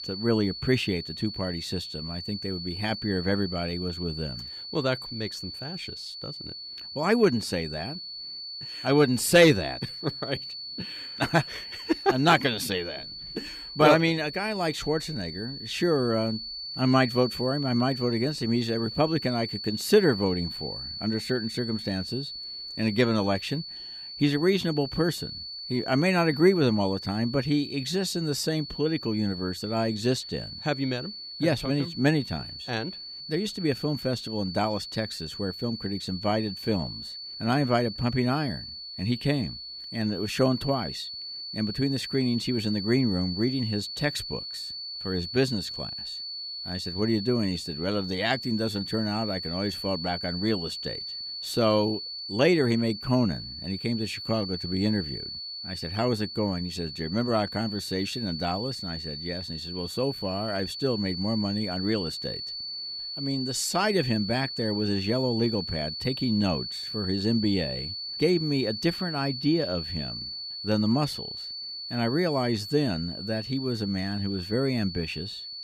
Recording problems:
high-pitched whine; loud; throughout; 4.5 kHz, 7 dB below the speech

